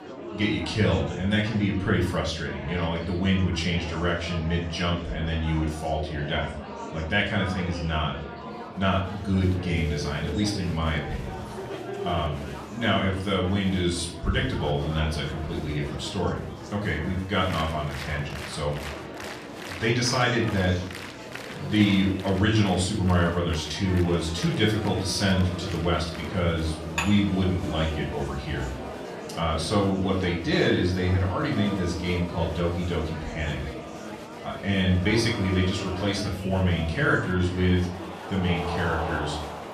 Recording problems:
off-mic speech; far
room echo; slight; dies away in 0.5 s
background music; noticeable; from 9 s on; 15 dB below the speech
murmuring crowd; noticeable; throughout; 10 dB below the speech
clattering dishes; noticeable; at 27 s; peak 4 dB below the speech

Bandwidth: 14.5 kHz